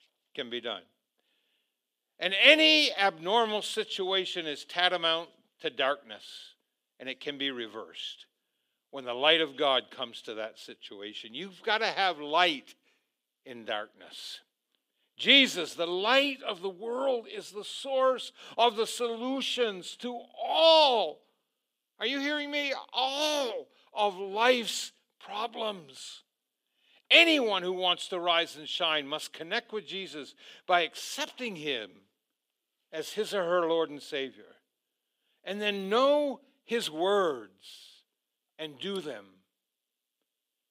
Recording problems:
thin; somewhat; fading below 400 Hz

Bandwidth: 15.5 kHz